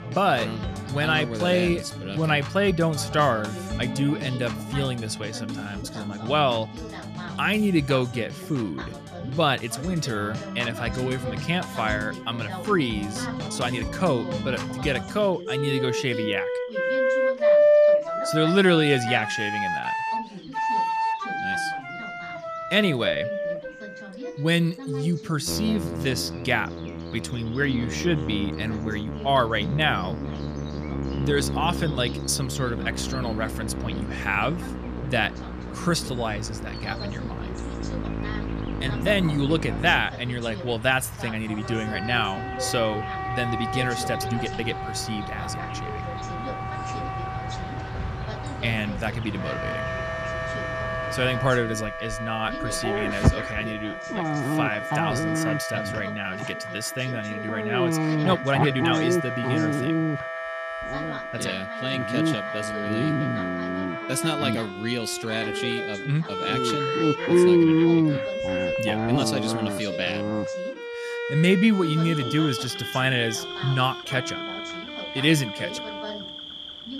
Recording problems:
animal sounds; loud; throughout; 4 dB below the speech
background music; loud; throughout; 4 dB below the speech
voice in the background; noticeable; throughout; 15 dB below the speech
uneven, jittery; strongly; from 13 to 59 s

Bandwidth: 14.5 kHz